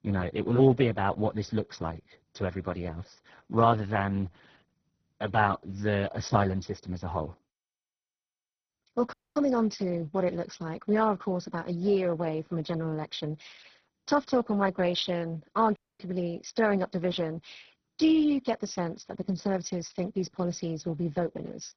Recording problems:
garbled, watery; badly; nothing above 6 kHz
audio cutting out; at 9 s and at 16 s

